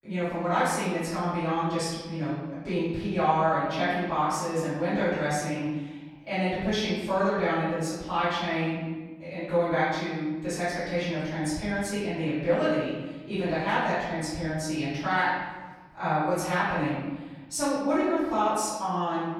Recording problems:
room echo; strong; dies away in 1.3 s
off-mic speech; far

